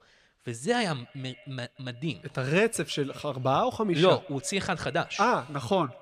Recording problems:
echo of what is said; faint; throughout; 170 ms later, 25 dB below the speech

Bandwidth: 15 kHz